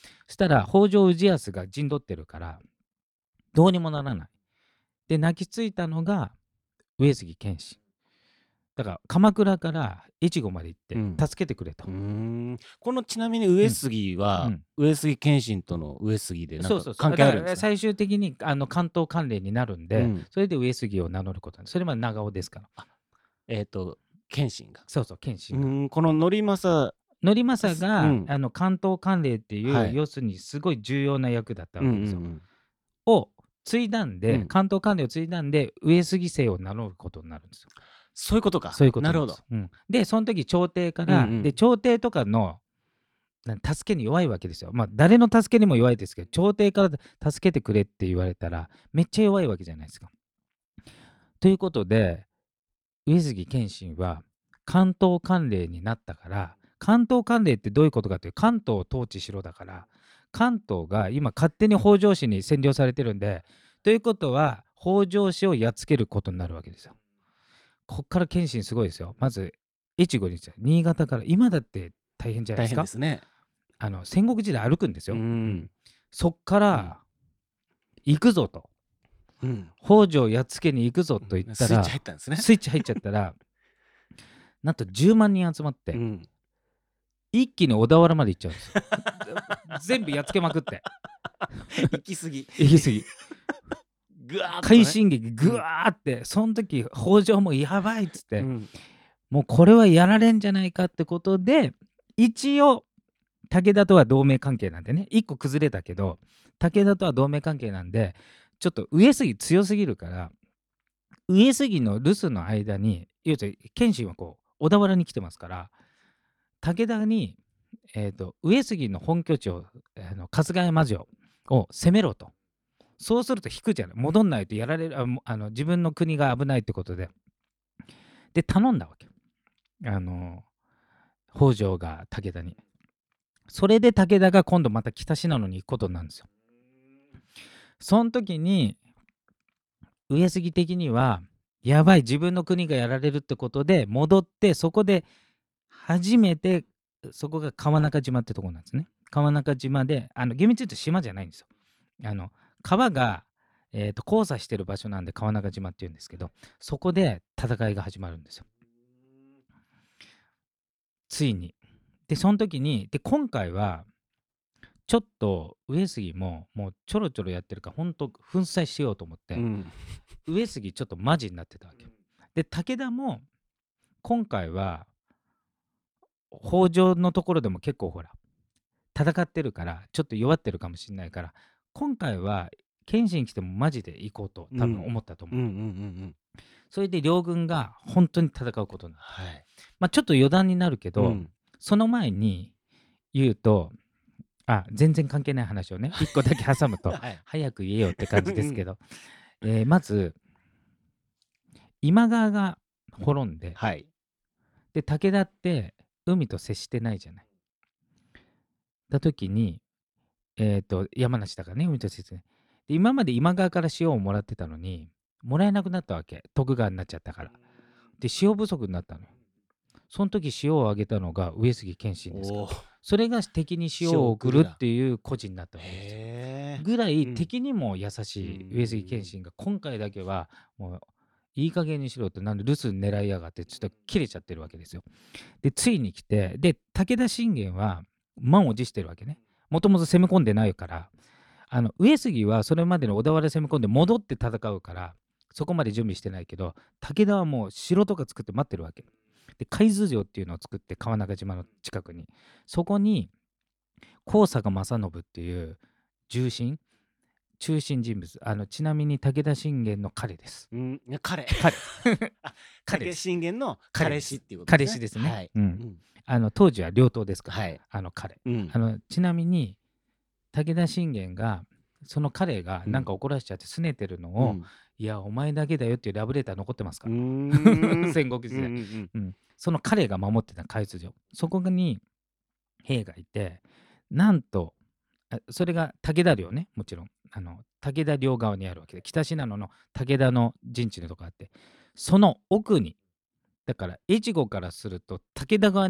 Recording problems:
abrupt cut into speech; at the end

